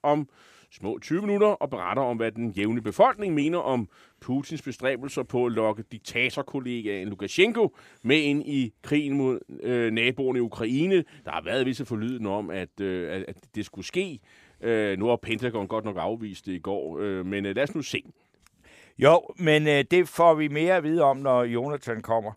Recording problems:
none

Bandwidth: 15 kHz